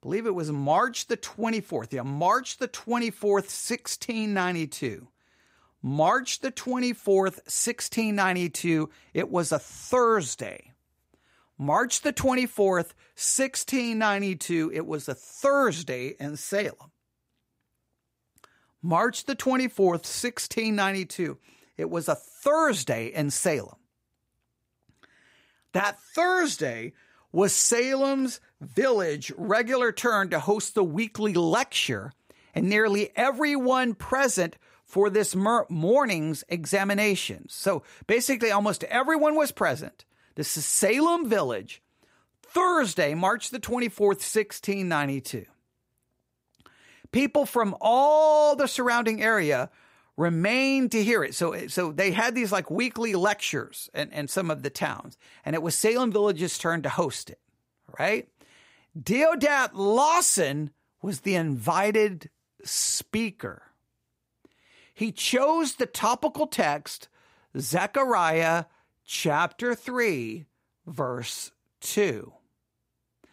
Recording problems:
none

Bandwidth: 15.5 kHz